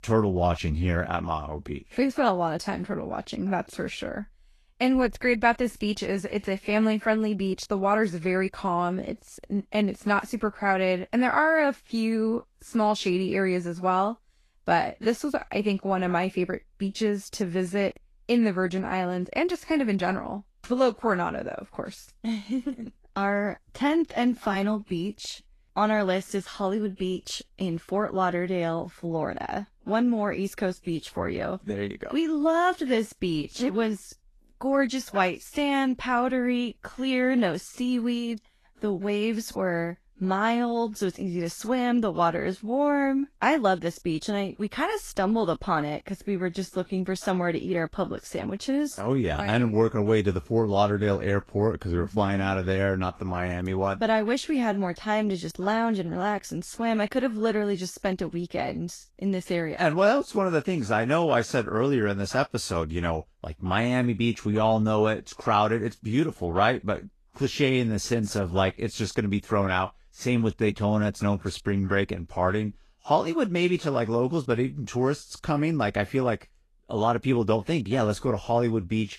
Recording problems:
garbled, watery; slightly; nothing above 12.5 kHz

